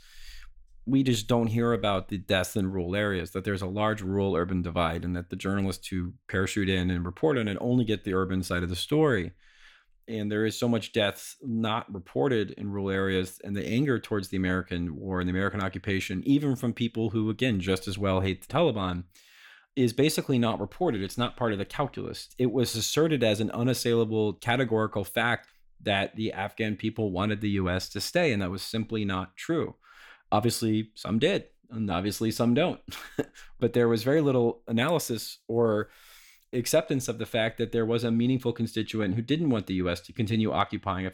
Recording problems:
none

